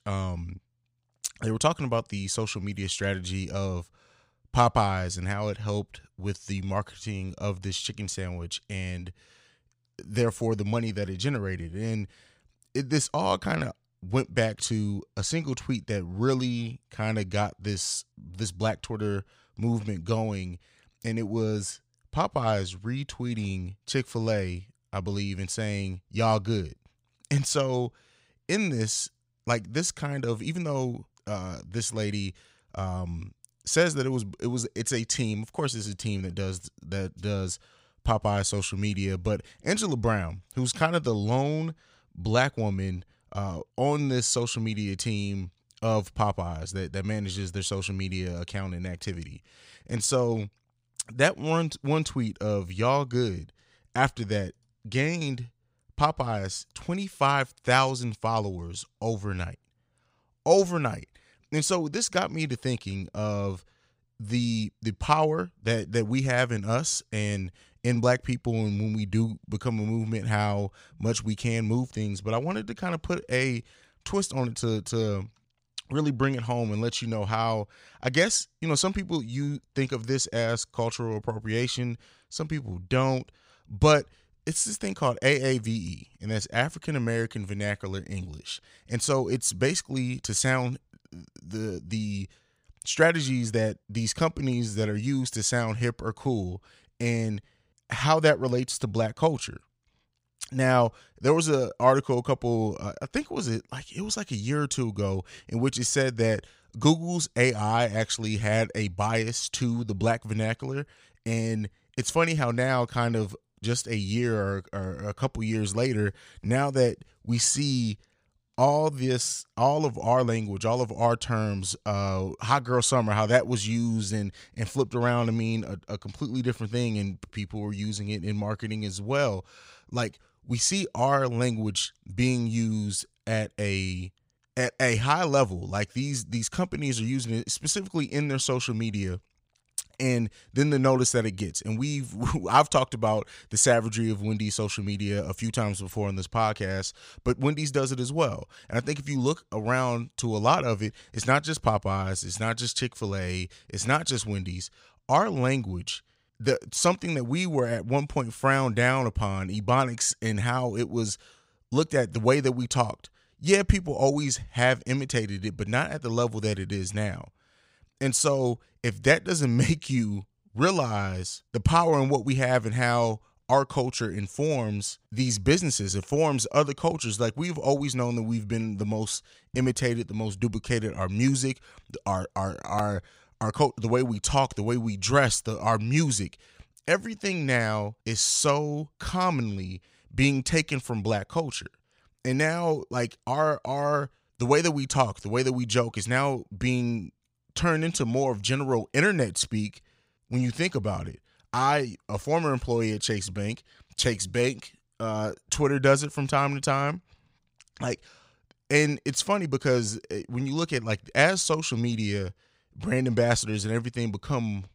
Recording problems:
none

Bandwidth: 15.5 kHz